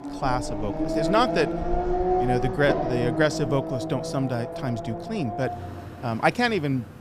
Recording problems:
traffic noise; loud; throughout; 2 dB below the speech

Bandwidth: 14.5 kHz